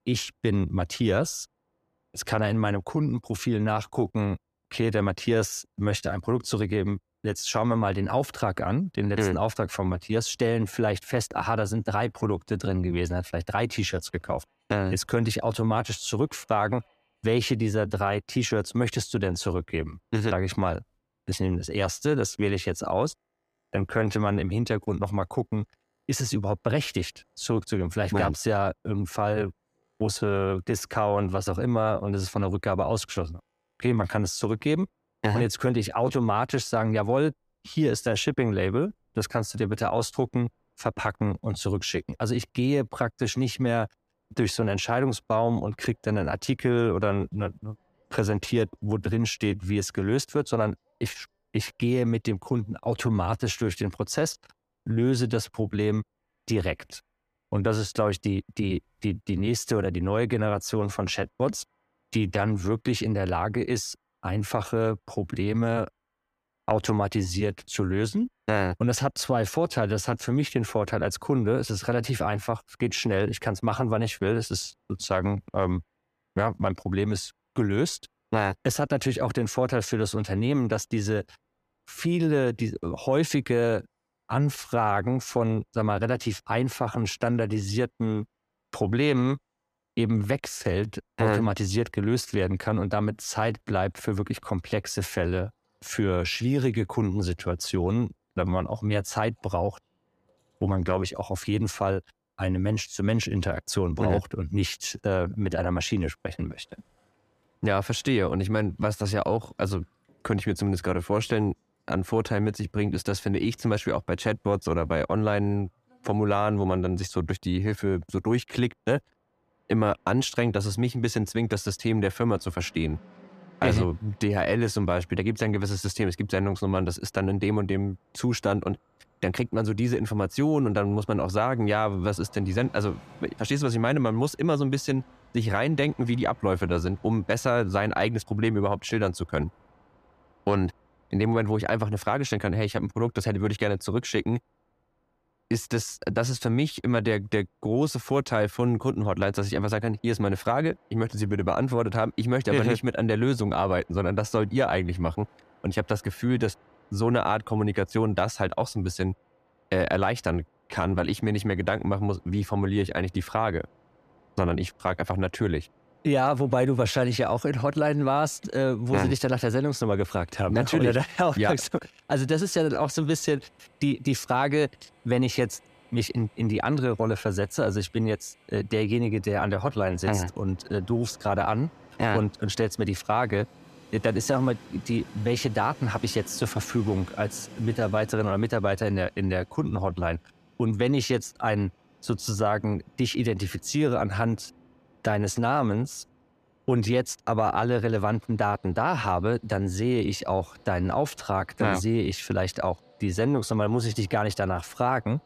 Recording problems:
train or aircraft noise; faint; throughout; 30 dB below the speech

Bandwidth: 14.5 kHz